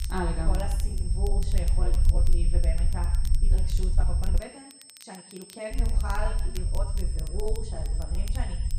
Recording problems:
room echo; noticeable; dies away in 0.8 s
off-mic speech; somewhat distant
high-pitched whine; loud; throughout; 8.5 kHz, 8 dB below the speech
low rumble; noticeable; until 4.5 s and from 5.5 s on; 10 dB below the speech
crackle, like an old record; noticeable; 10 dB below the speech
uneven, jittery; strongly; from 1 to 8.5 s

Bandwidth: 15 kHz